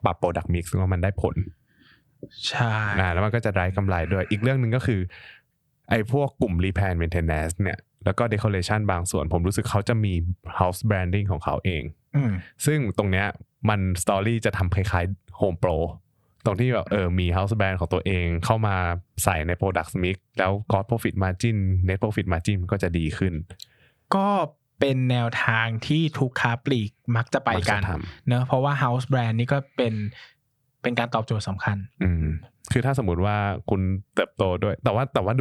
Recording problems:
squashed, flat; somewhat
abrupt cut into speech; at the end

